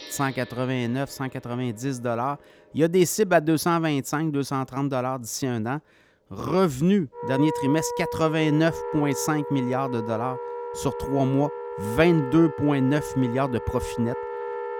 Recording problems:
background music; loud; throughout; 8 dB below the speech

